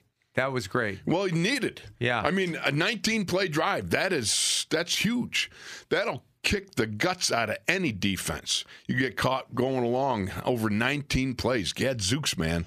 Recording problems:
squashed, flat; somewhat

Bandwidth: 15 kHz